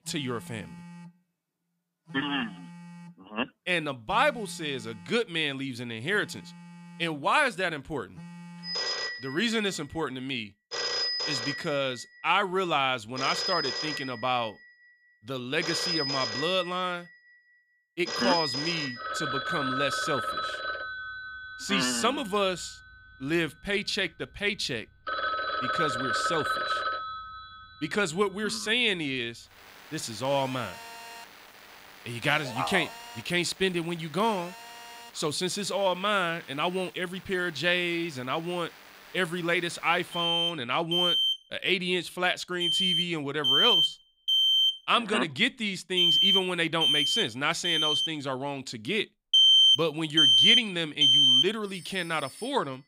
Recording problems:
alarms or sirens; very loud; throughout; 5 dB above the speech

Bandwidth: 15.5 kHz